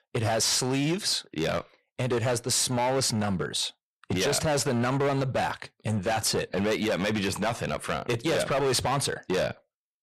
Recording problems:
distortion; heavy; 17% of the sound clipped

